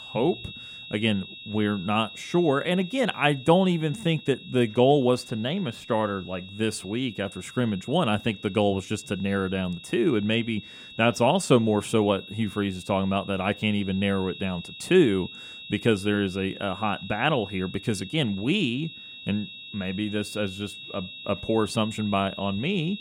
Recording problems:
high-pitched whine; noticeable; throughout; 3.5 kHz, 15 dB below the speech

